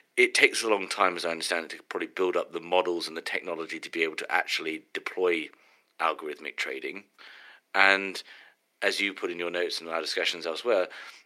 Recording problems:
thin; very; fading below 400 Hz

